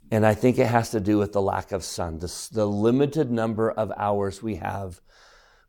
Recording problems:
none

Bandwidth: 18 kHz